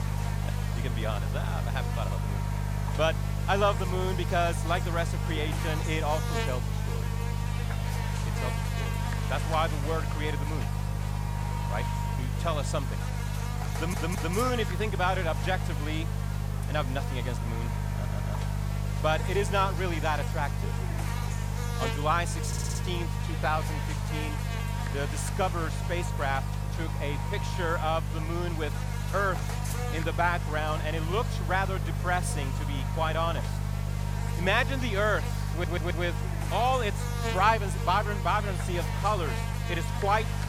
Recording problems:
electrical hum; loud; throughout; 50 Hz, 8 dB below the speech
audio stuttering; 4 times, first at 14 s

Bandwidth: 17 kHz